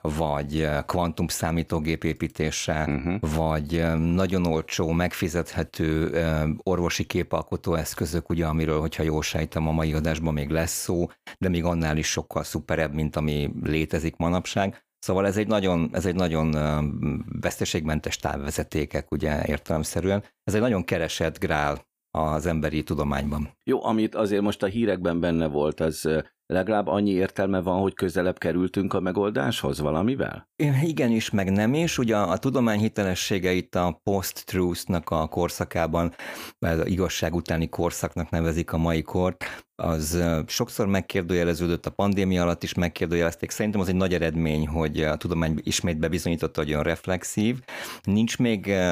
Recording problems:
abrupt cut into speech; at the end

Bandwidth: 15 kHz